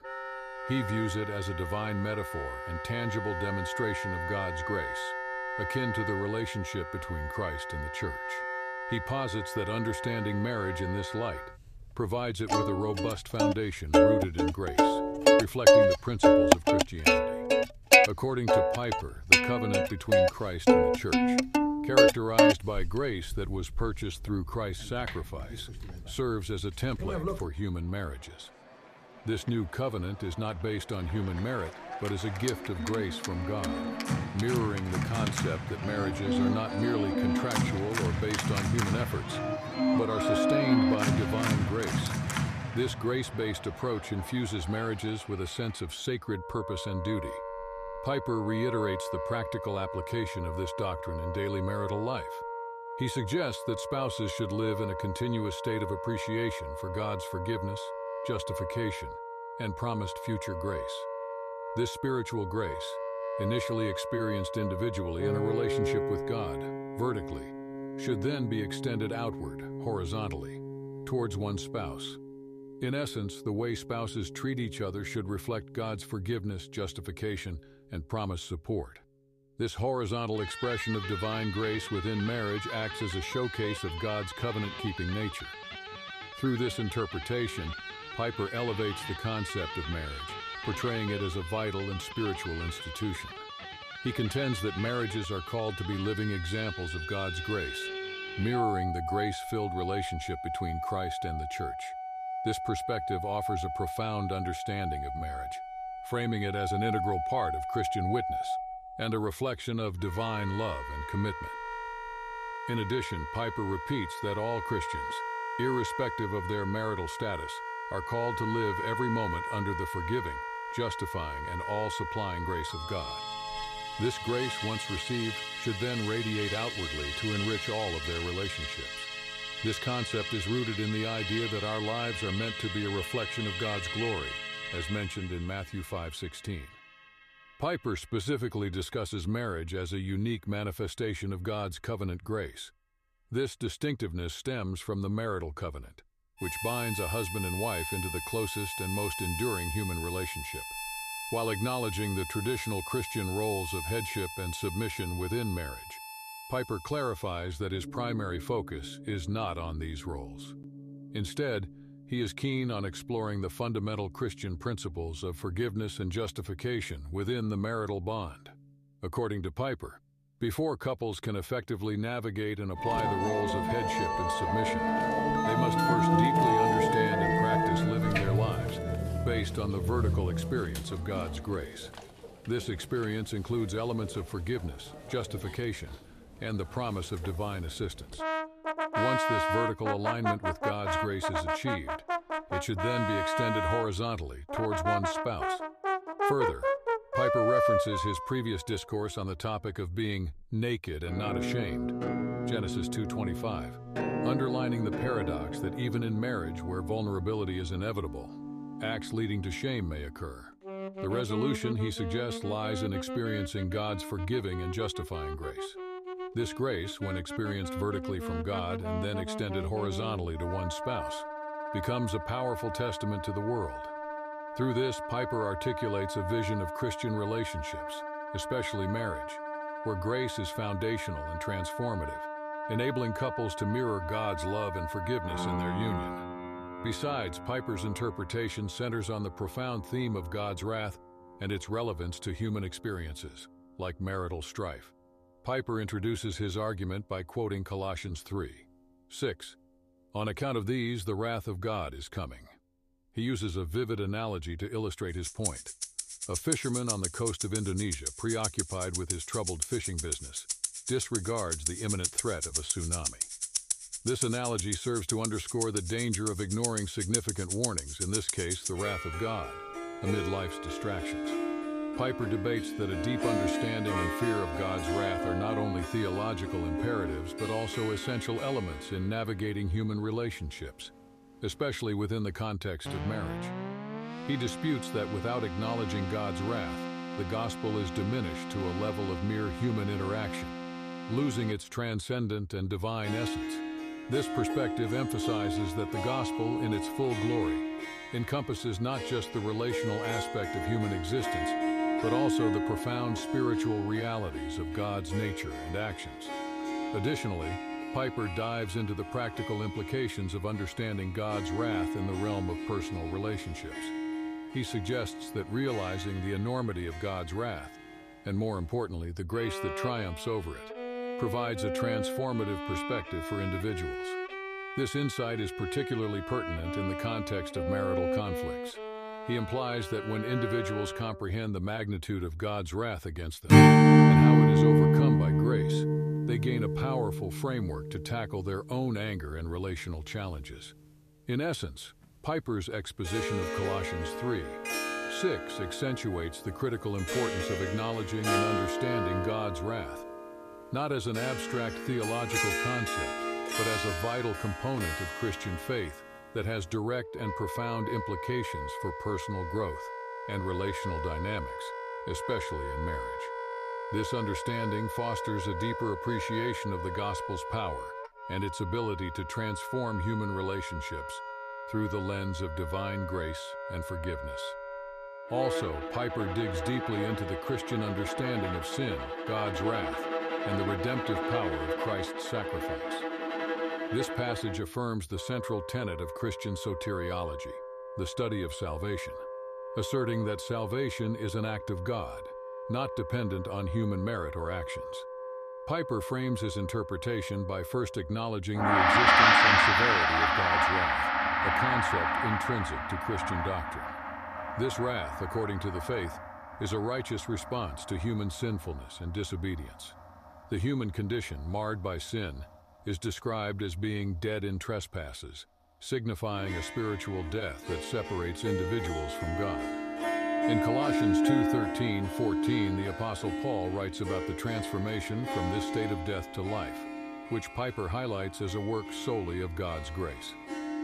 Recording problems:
background music; very loud; throughout; 2 dB above the speech

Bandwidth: 14.5 kHz